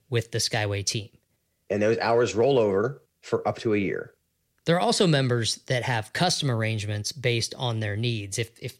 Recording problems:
none

